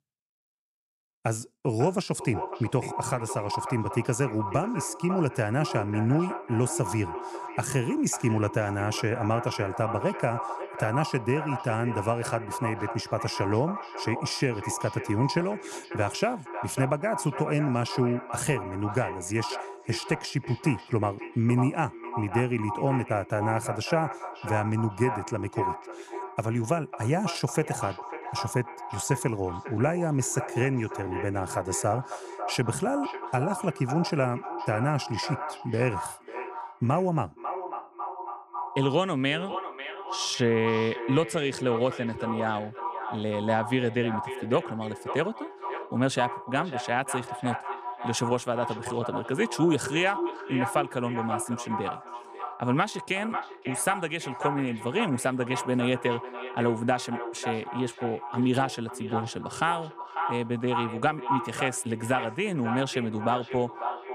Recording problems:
echo of what is said; strong; throughout; 550 ms later, 8 dB below the speech

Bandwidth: 14.5 kHz